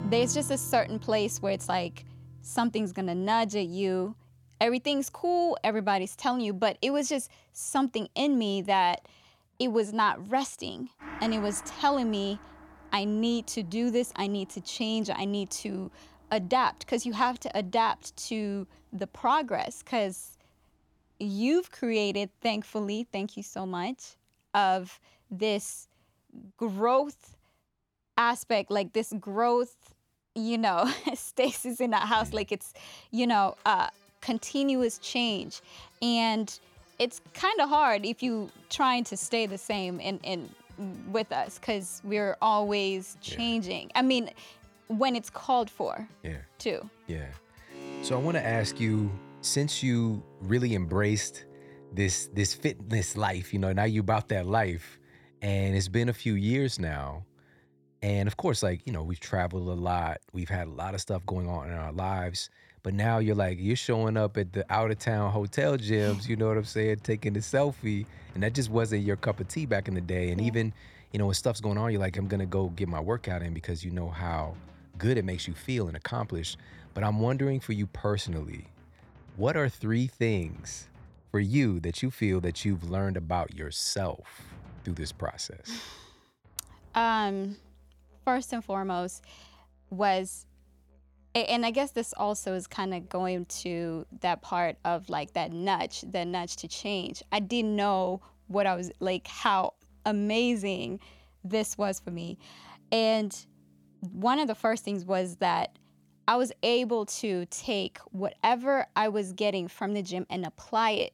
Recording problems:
background music; faint; throughout; 20 dB below the speech

